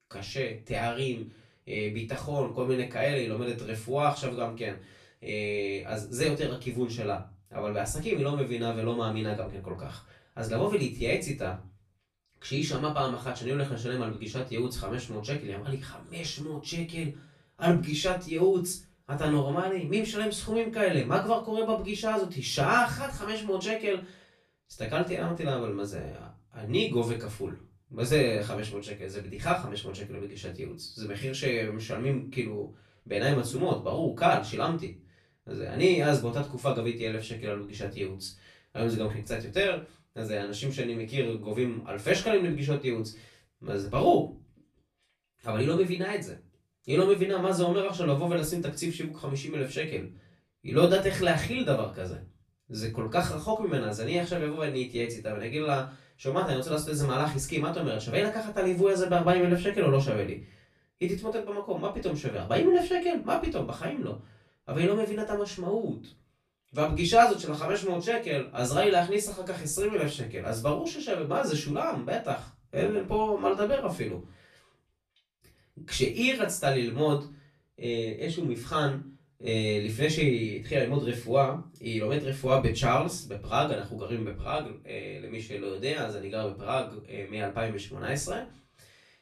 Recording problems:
off-mic speech; far
room echo; slight; dies away in 0.3 s

